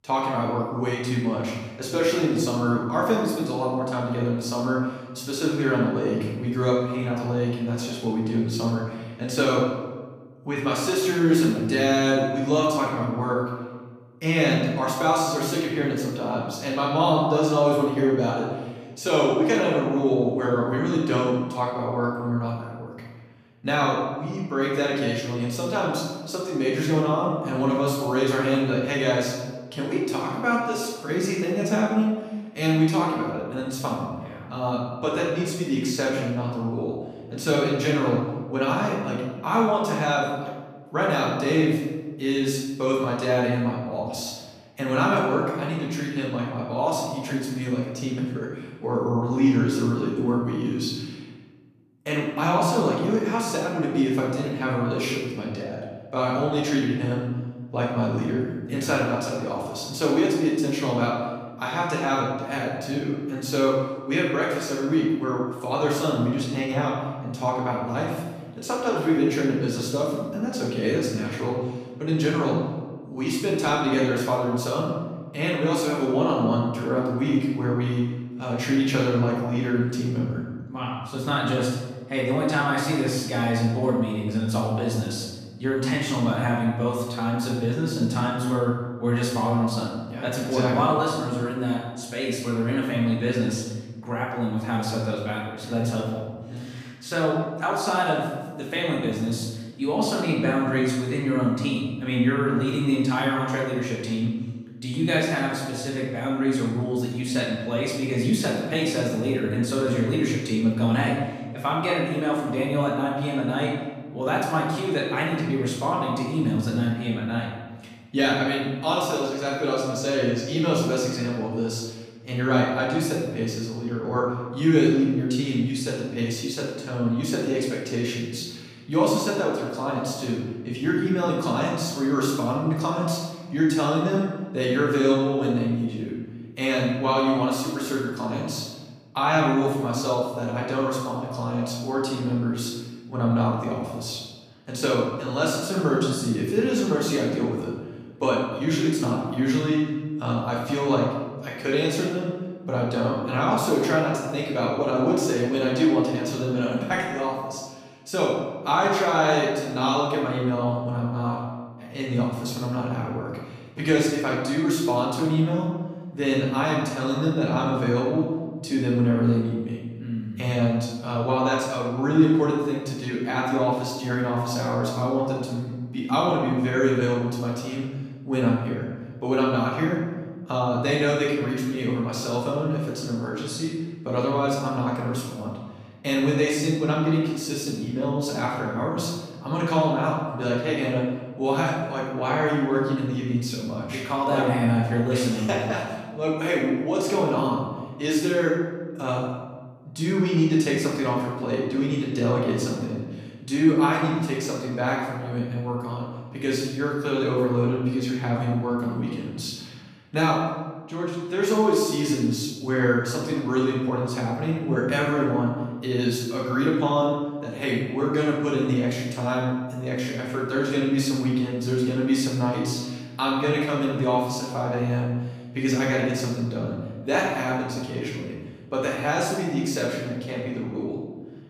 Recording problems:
off-mic speech; far
room echo; noticeable; dies away in 1.1 s

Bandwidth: 14.5 kHz